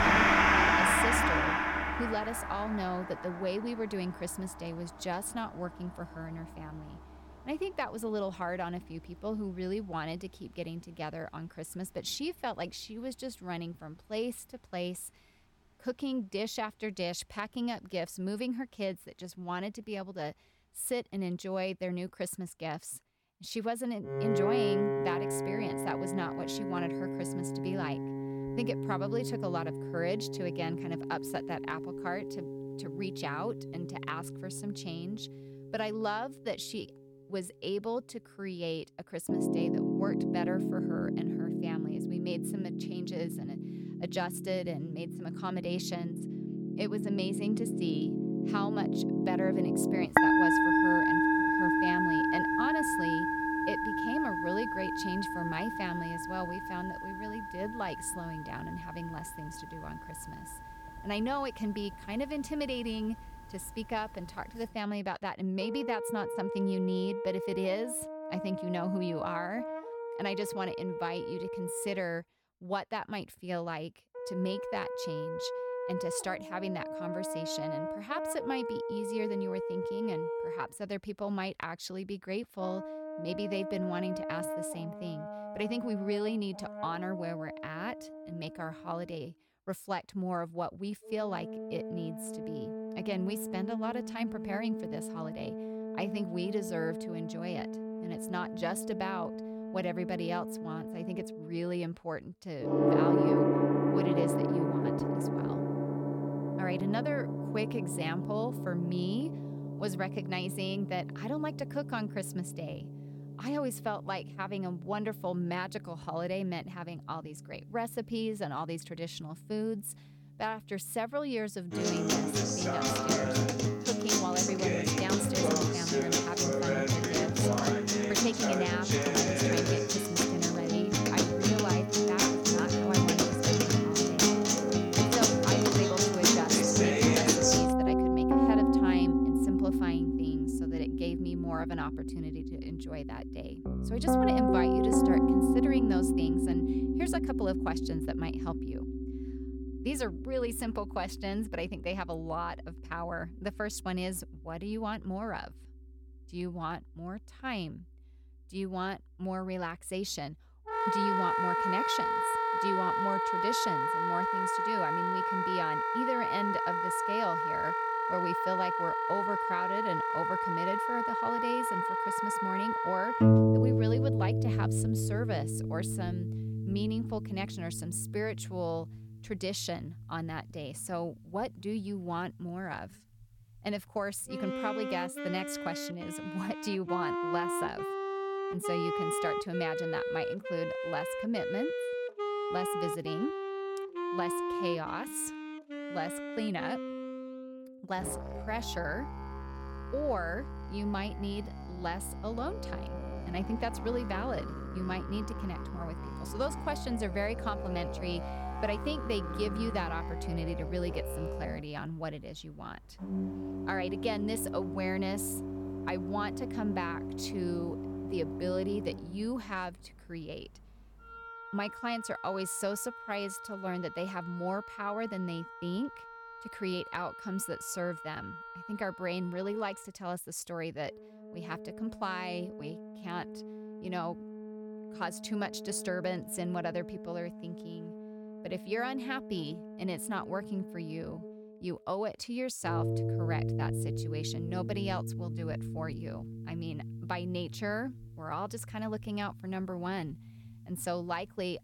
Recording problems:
background music; very loud; throughout; 5 dB above the speech

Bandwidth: 17.5 kHz